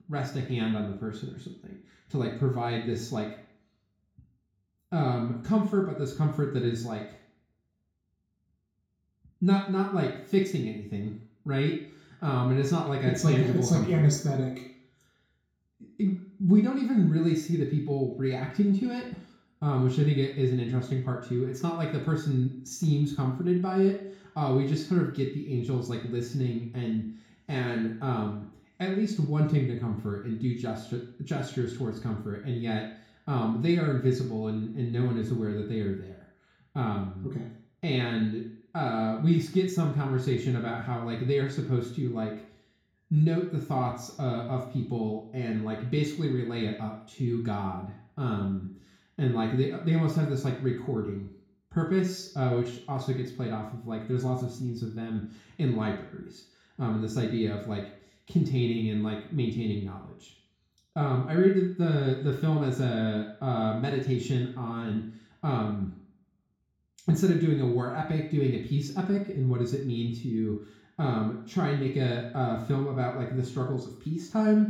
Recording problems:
off-mic speech; far
room echo; noticeable; dies away in 0.6 s

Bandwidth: 18.5 kHz